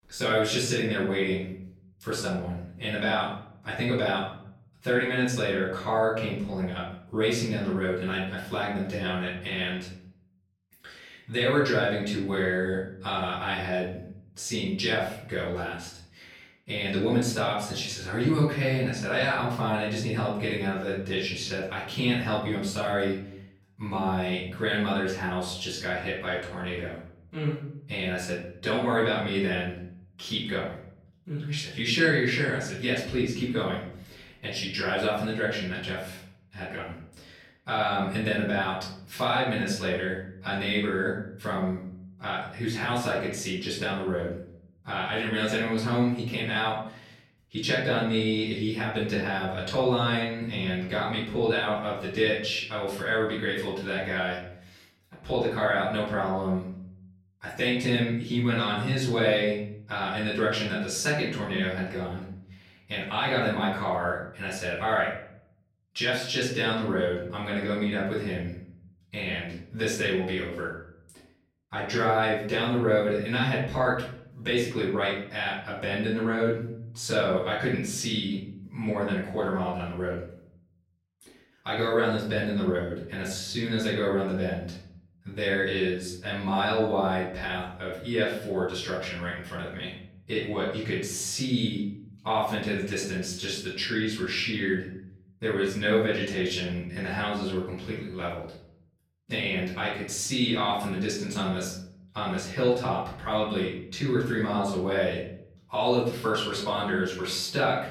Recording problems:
off-mic speech; far
room echo; noticeable; dies away in 0.7 s

